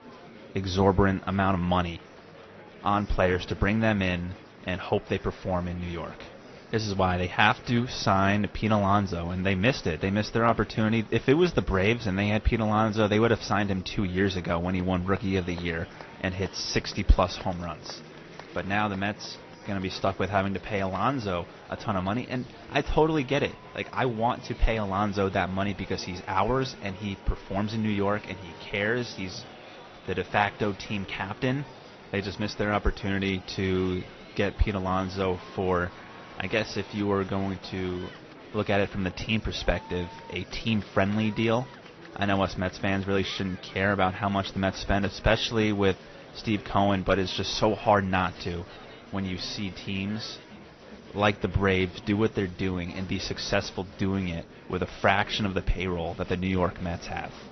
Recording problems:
garbled, watery; slightly; nothing above 6 kHz
high frequencies cut off; slight
murmuring crowd; noticeable; throughout; 20 dB below the speech

